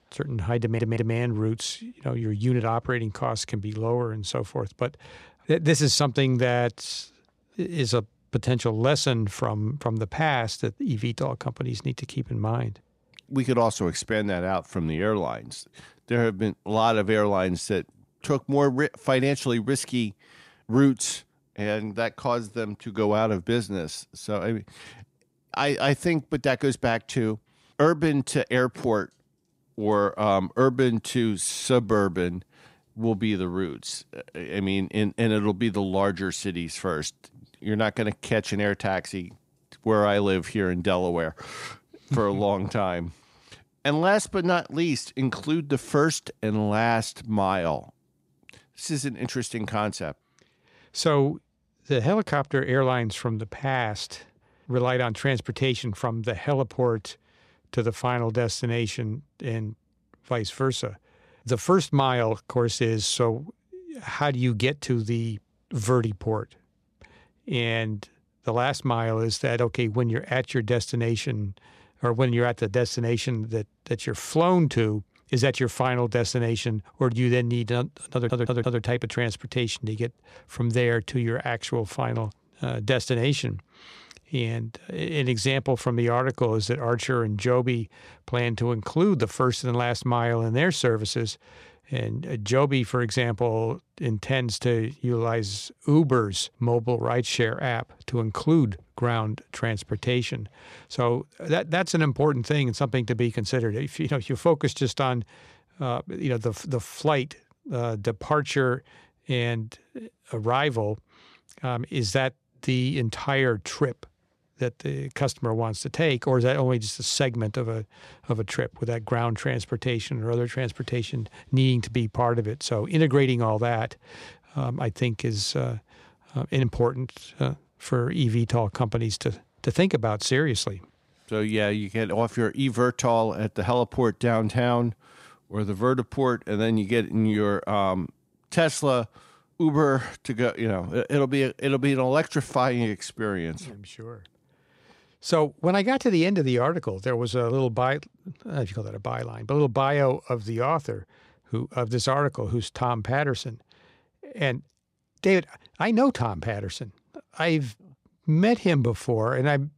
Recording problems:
audio stuttering; at 0.5 s and at 1:18

